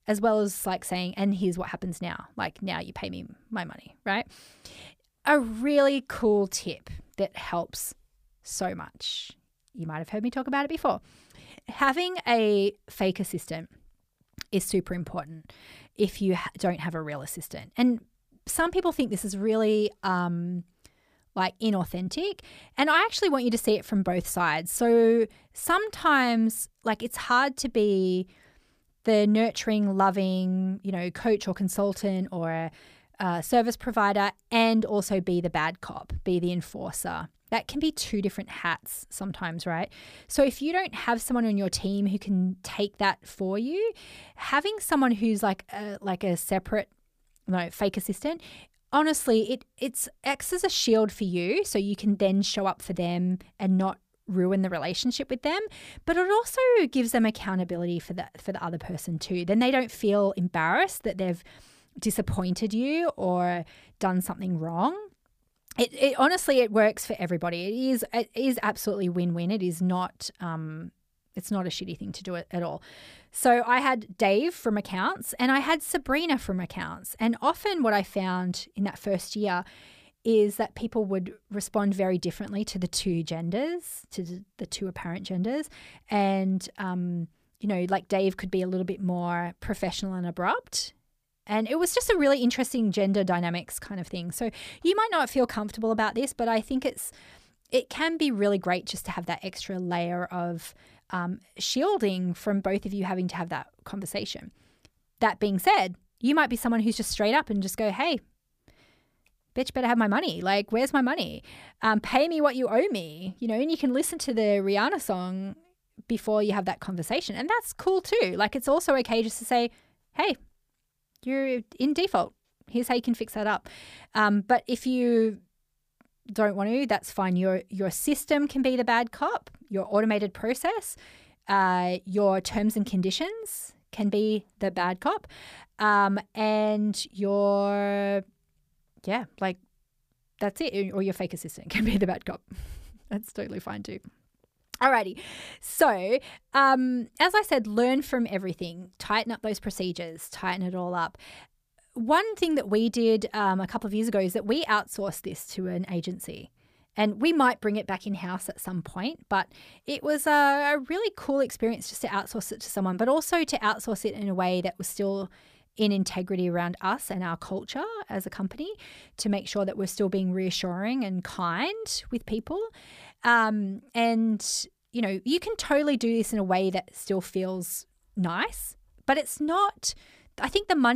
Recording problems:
abrupt cut into speech; at the end

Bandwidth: 15 kHz